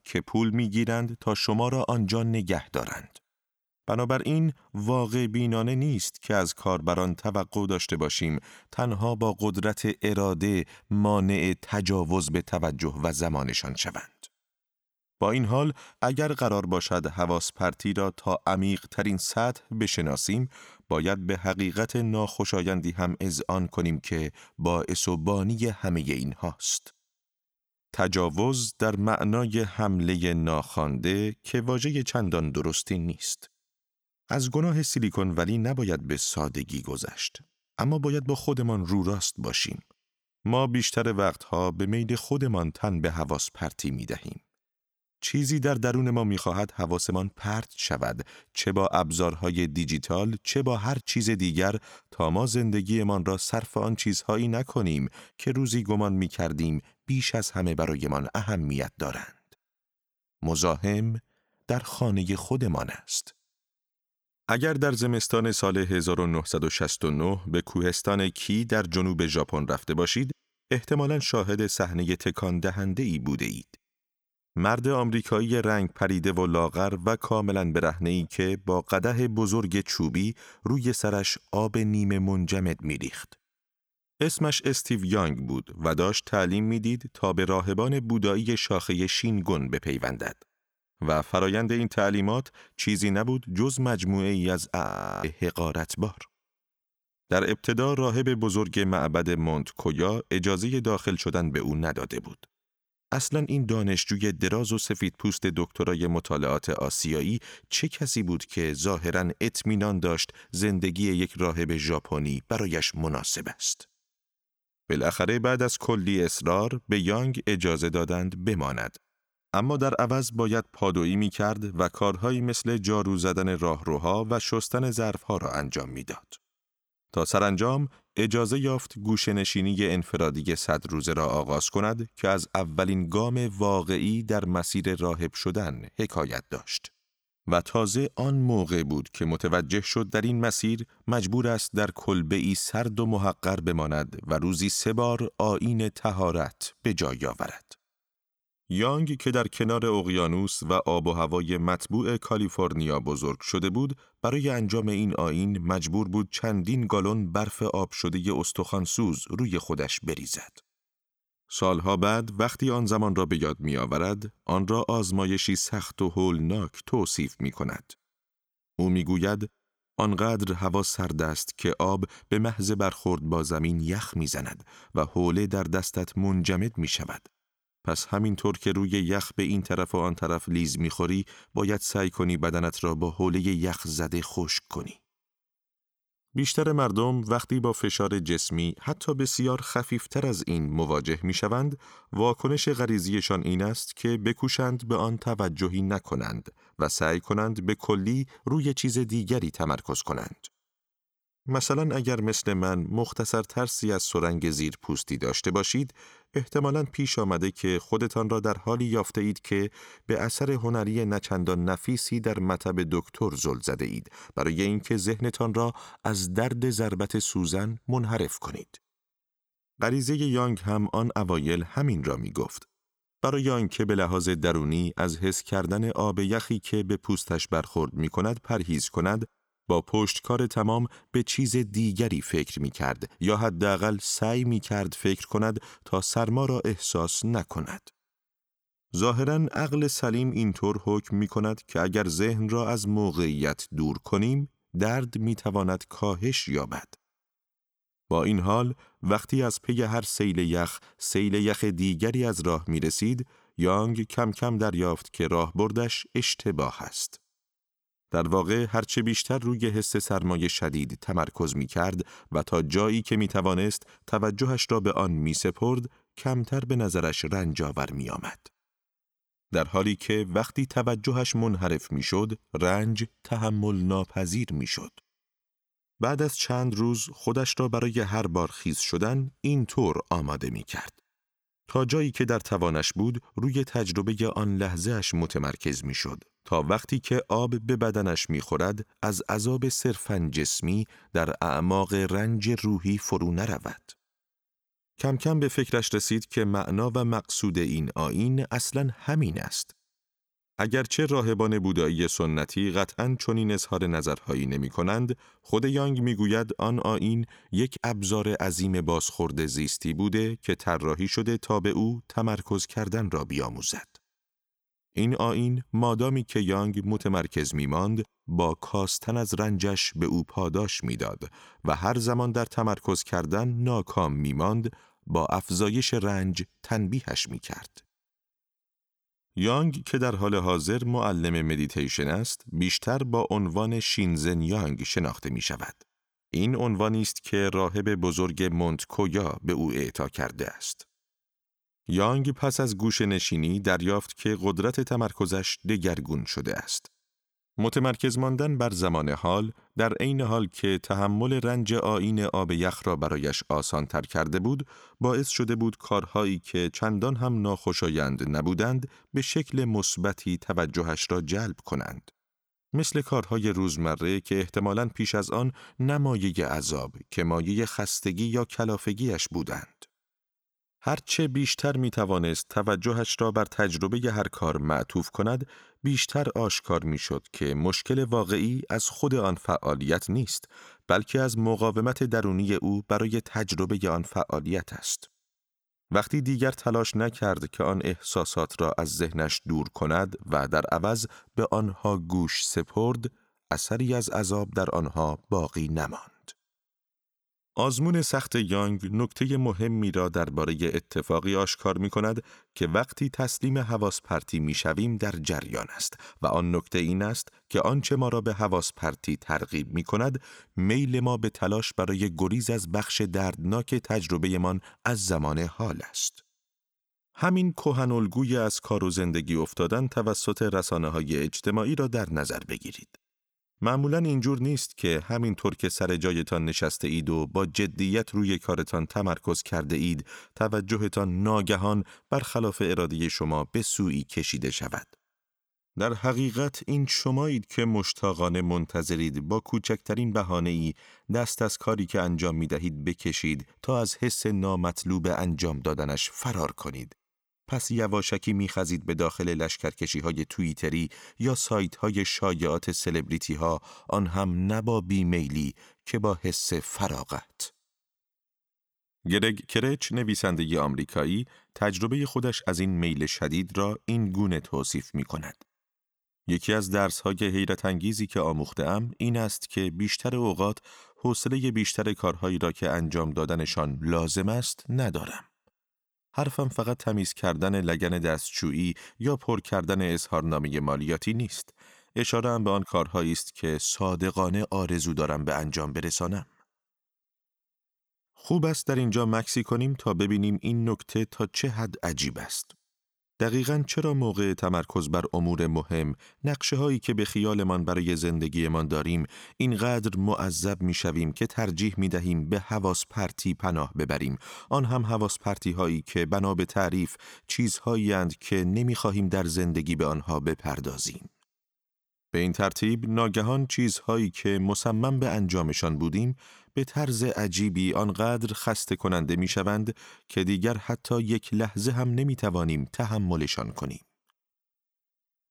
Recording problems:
audio freezing; at 1:35

